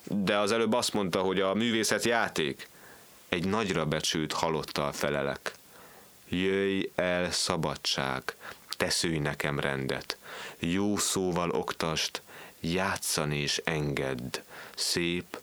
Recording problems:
squashed, flat; heavily

